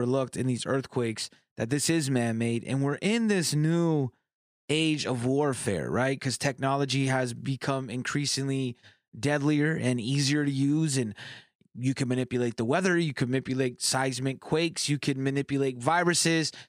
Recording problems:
abrupt cut into speech; at the start

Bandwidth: 15 kHz